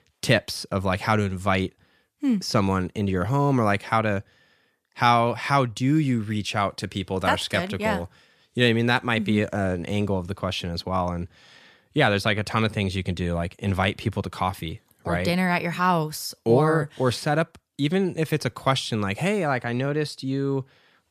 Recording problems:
none

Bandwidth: 14.5 kHz